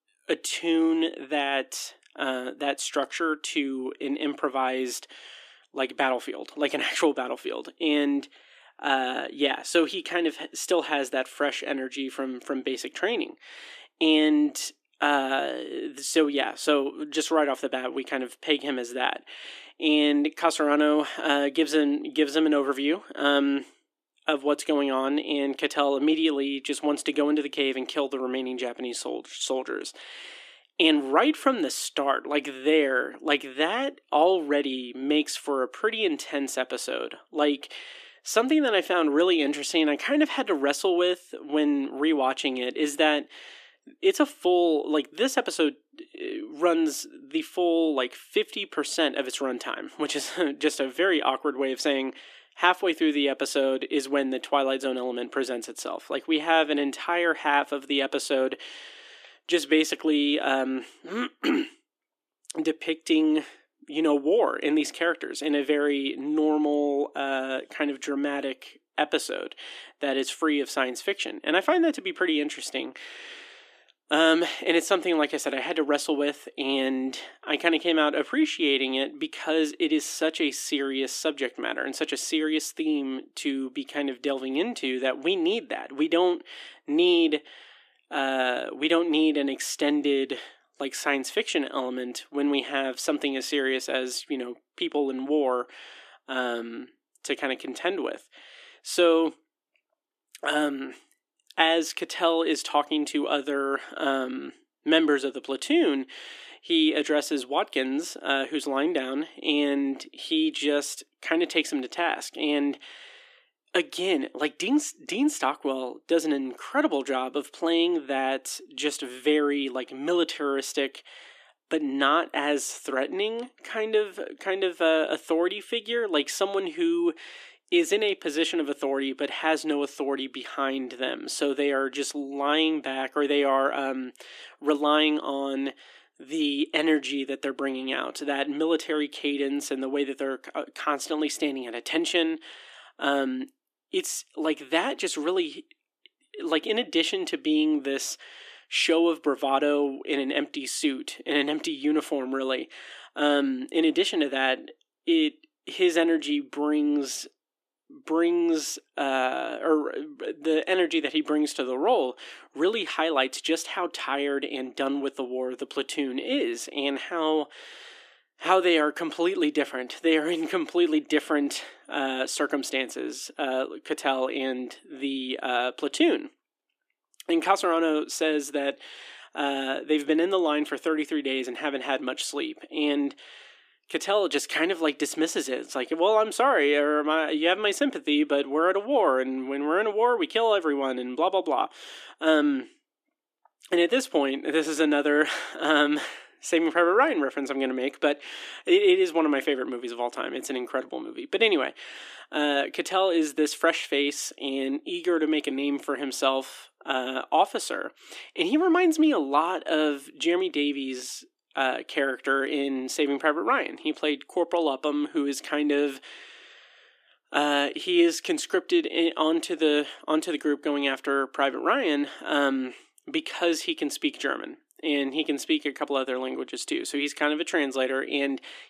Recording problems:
thin; very slightly; fading below 300 Hz

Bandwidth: 14.5 kHz